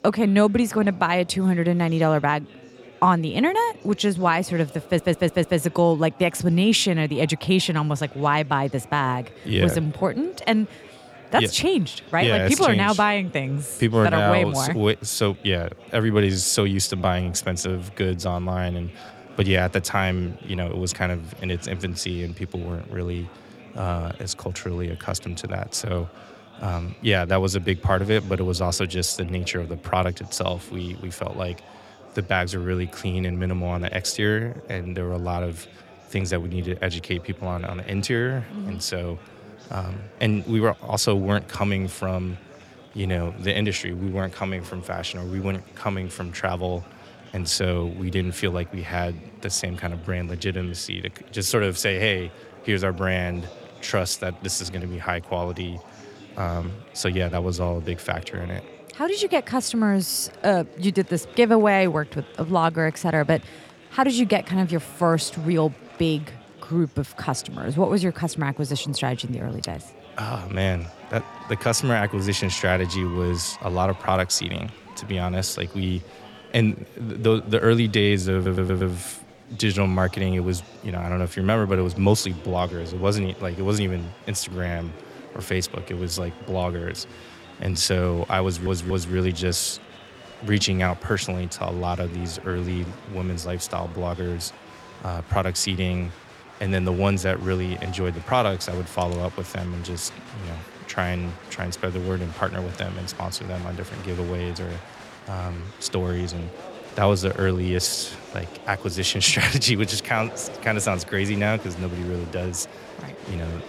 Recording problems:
murmuring crowd; noticeable; throughout; 20 dB below the speech
audio stuttering; at 5 s, at 1:18 and at 1:28

